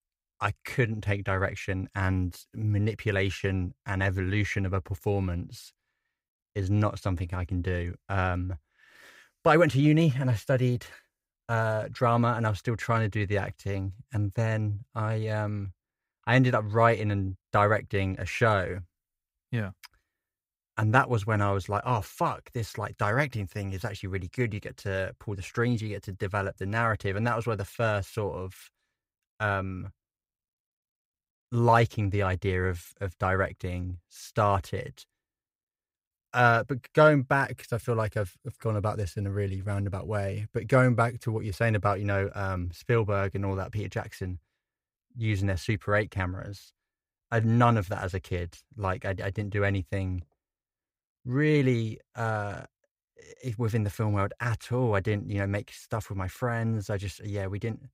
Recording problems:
none

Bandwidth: 15.5 kHz